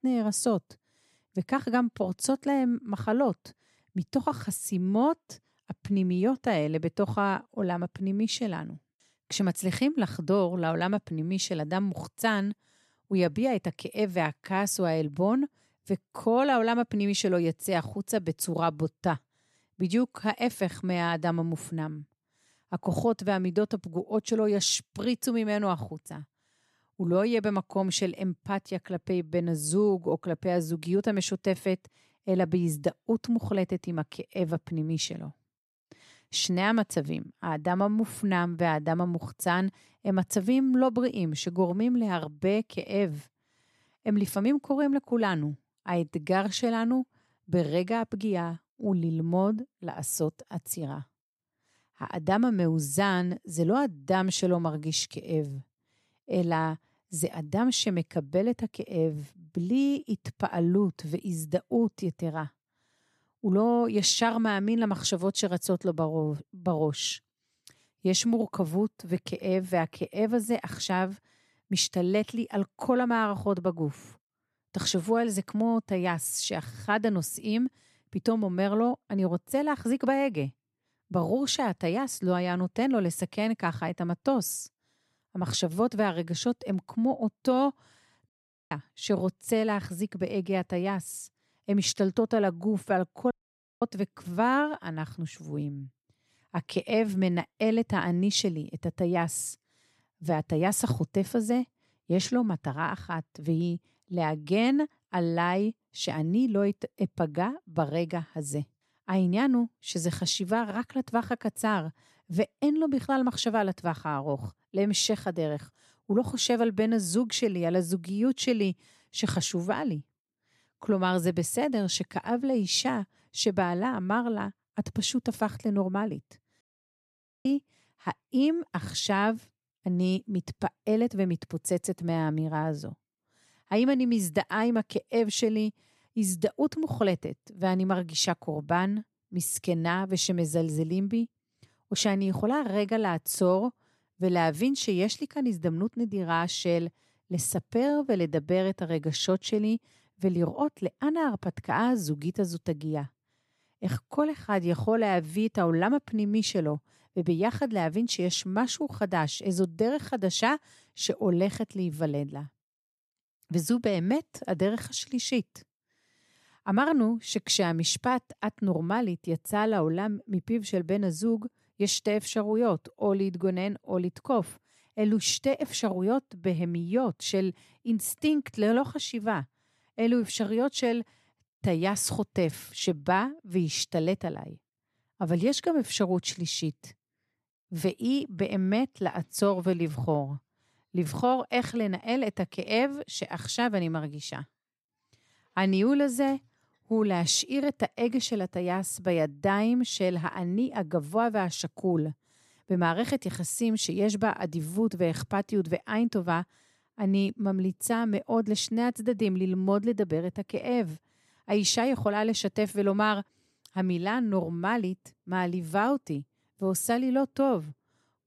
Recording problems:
audio cutting out; at 1:28, at 1:33 for 0.5 s and at 2:07 for 1 s

